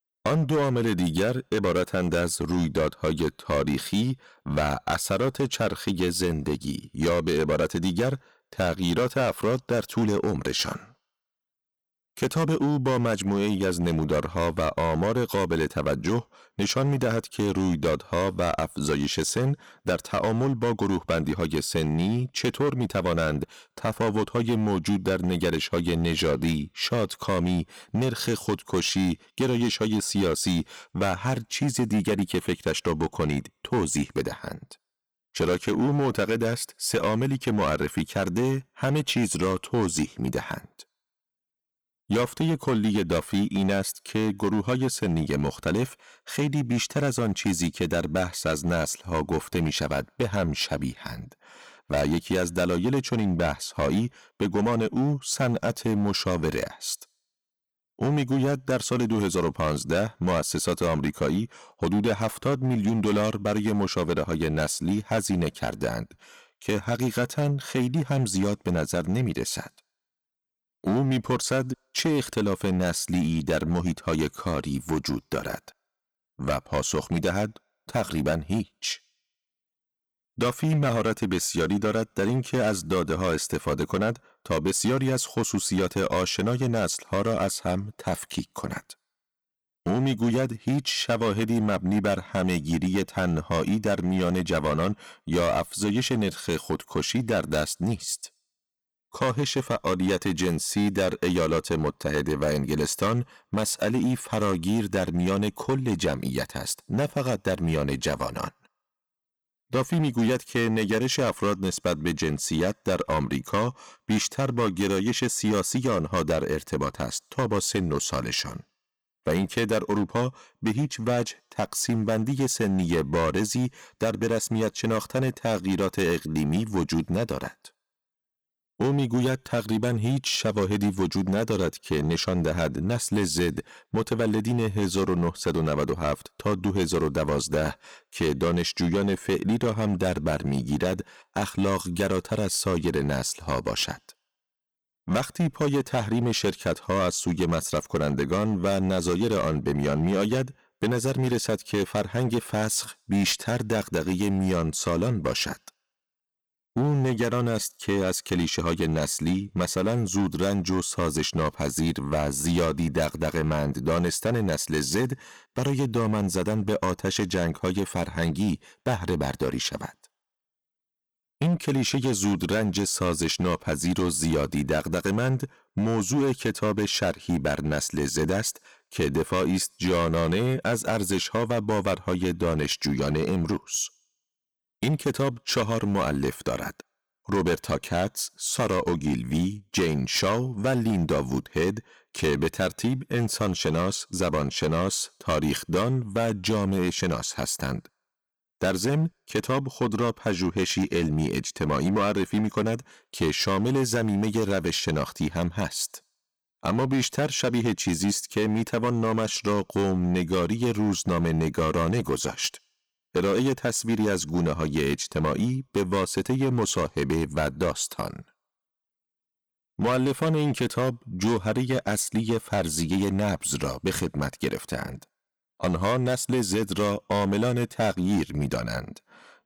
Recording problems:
distortion; slight; 10% of the sound clipped

